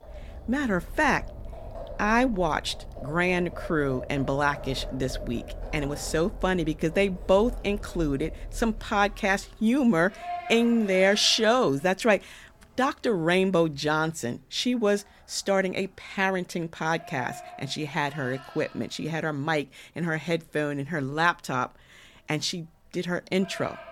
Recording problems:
animal sounds; noticeable; throughout; 15 dB below the speech

